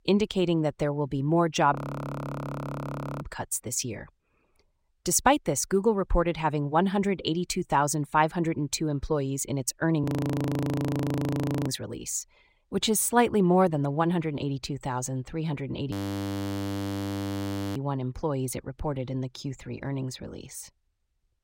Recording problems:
audio freezing; at 1.5 s for 1.5 s, at 10 s for 1.5 s and at 16 s for 2 s

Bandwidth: 16 kHz